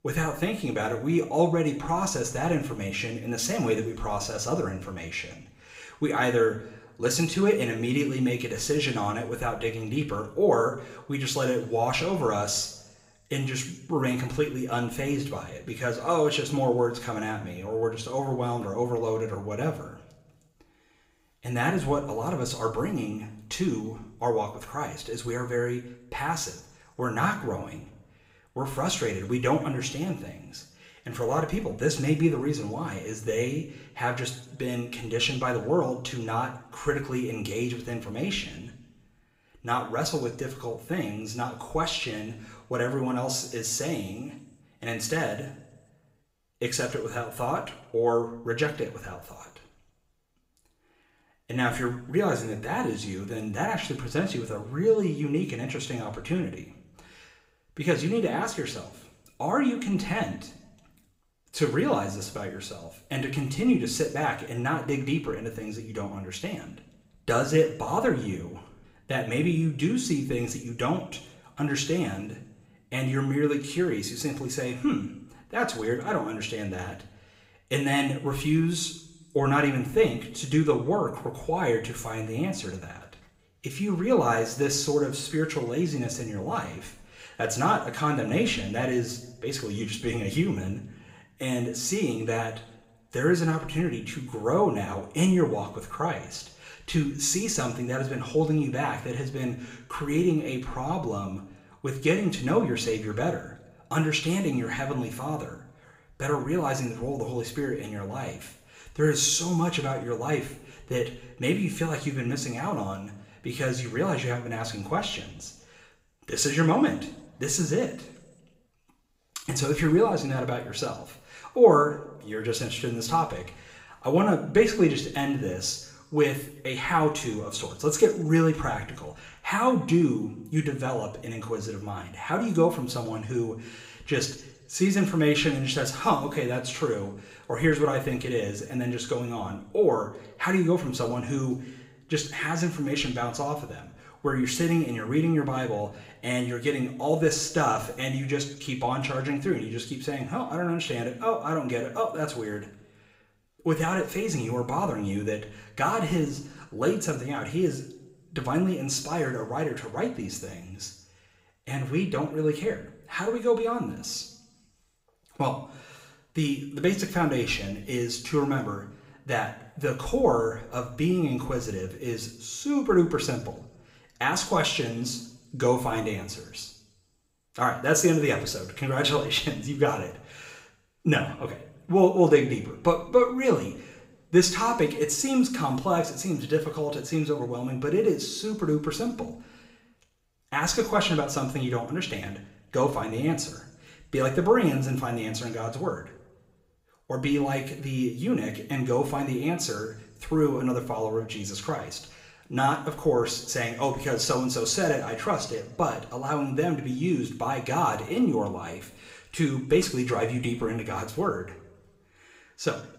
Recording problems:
room echo; slight; dies away in 0.6 s
off-mic speech; somewhat distant

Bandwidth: 15.5 kHz